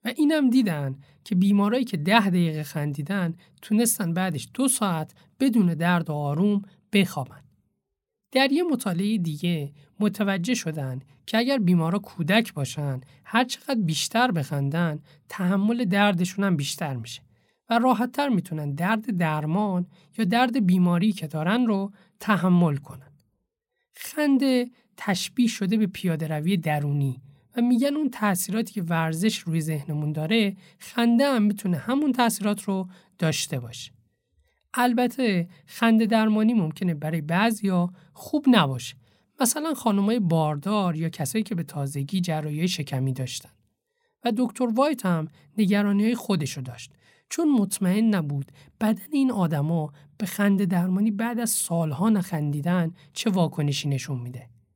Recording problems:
none

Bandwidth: 16.5 kHz